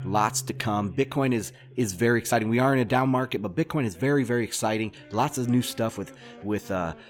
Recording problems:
background music; noticeable; throughout; 20 dB below the speech
background chatter; faint; throughout; 2 voices, 30 dB below the speech

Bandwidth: 17.5 kHz